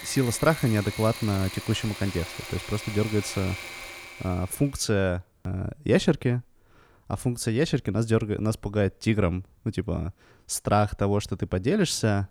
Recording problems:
machinery noise; noticeable; until 4.5 s; 10 dB below the speech

